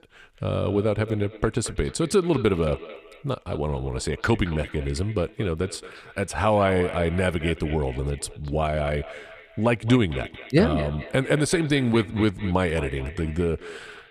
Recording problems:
echo of what is said; noticeable; throughout; 220 ms later, 15 dB below the speech

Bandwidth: 15 kHz